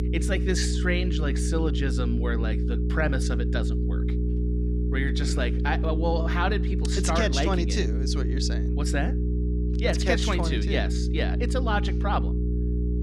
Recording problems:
electrical hum; loud; throughout; 60 Hz, 7 dB below the speech

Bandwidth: 14.5 kHz